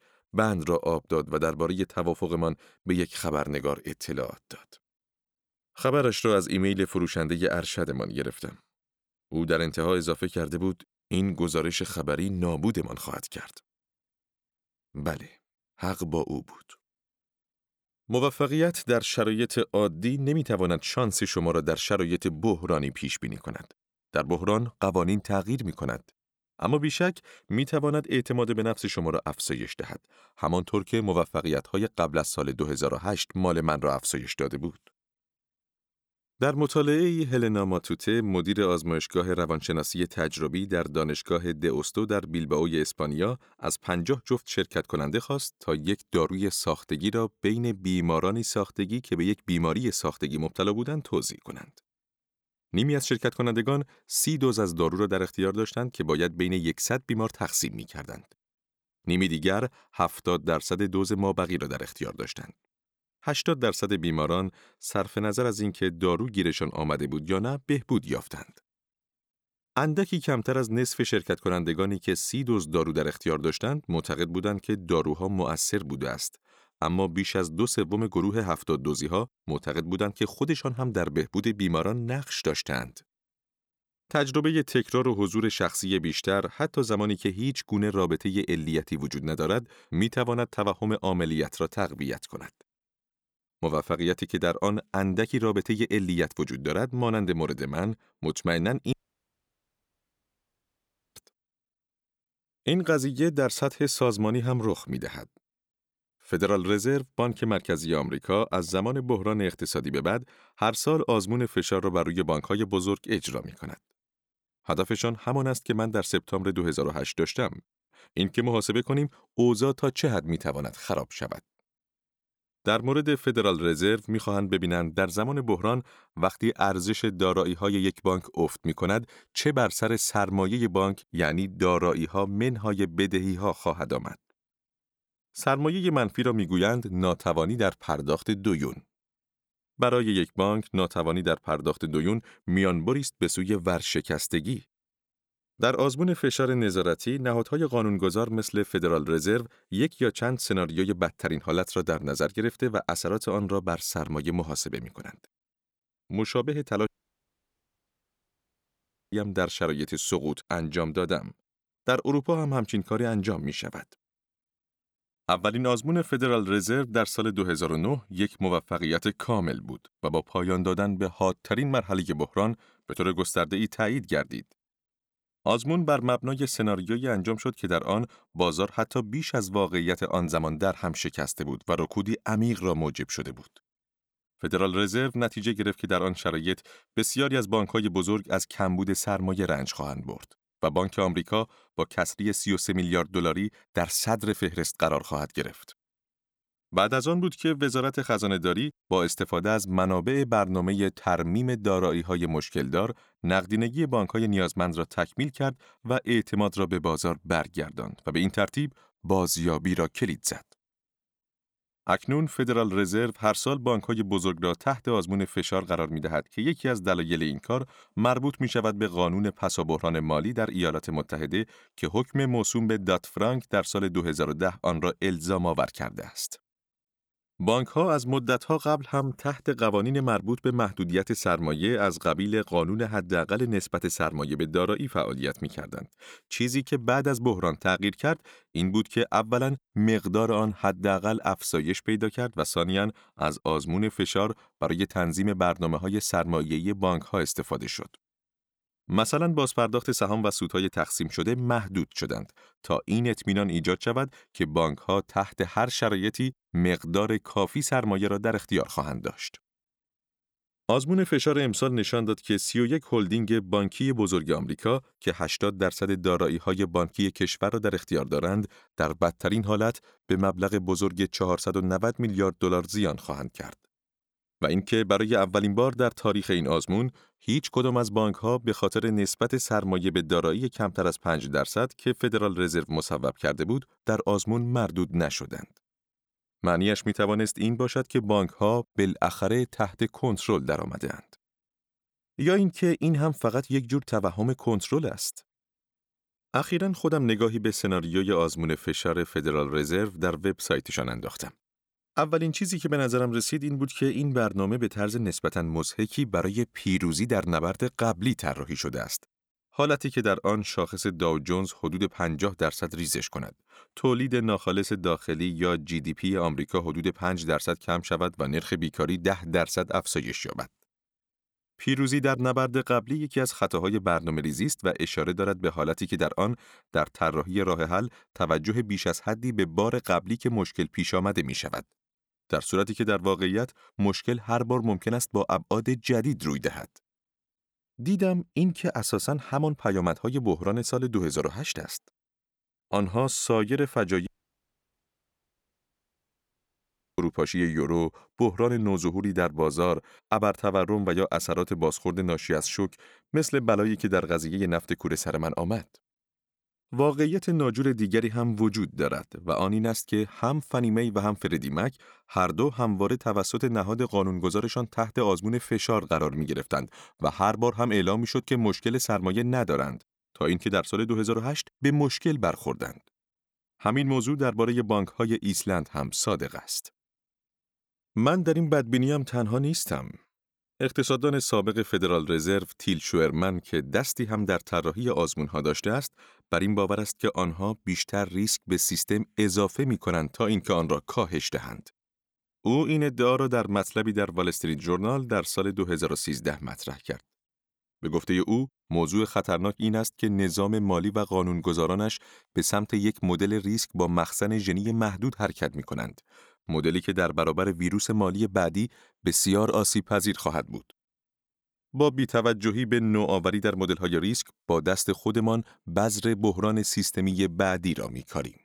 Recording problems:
audio cutting out; at 1:39 for 2 s, at 2:37 for 2.5 s and at 5:44 for 3 s

